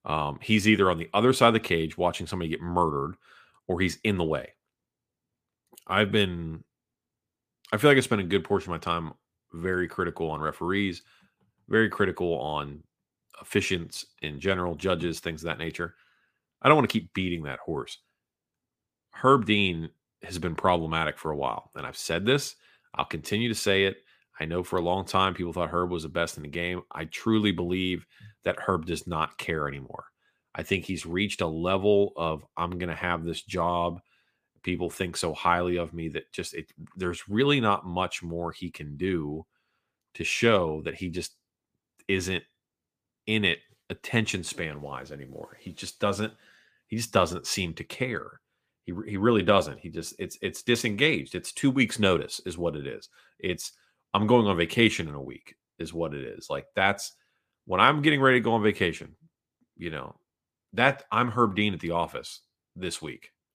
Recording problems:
none

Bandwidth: 15 kHz